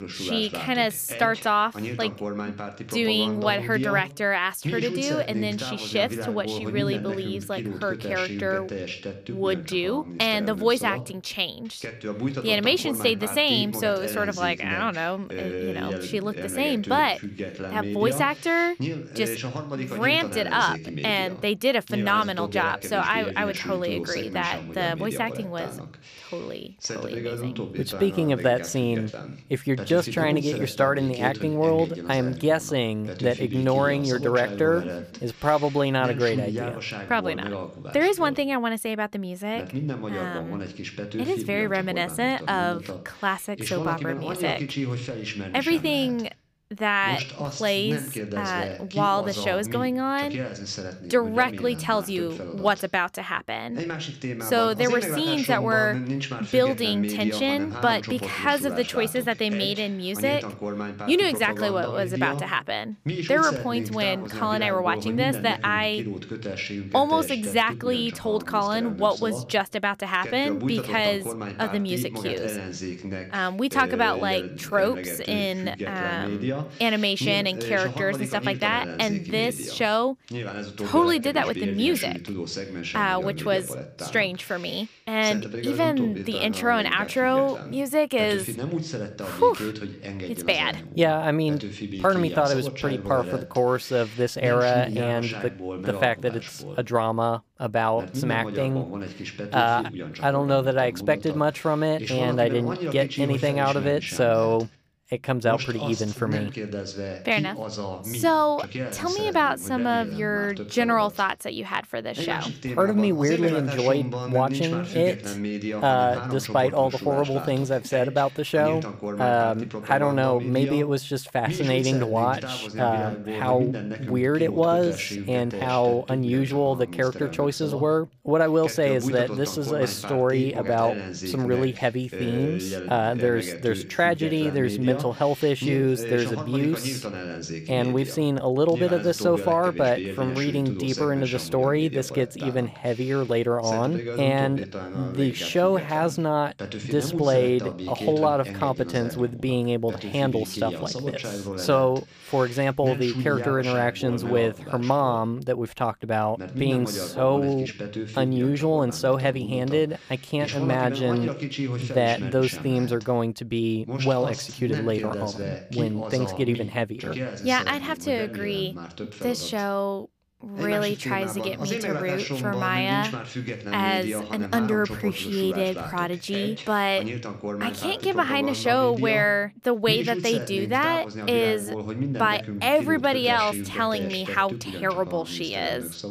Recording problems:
voice in the background; loud; throughout; 8 dB below the speech

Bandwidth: 15 kHz